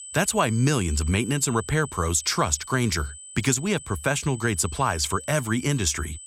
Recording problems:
high-pitched whine; noticeable; throughout; 8 kHz, 15 dB below the speech

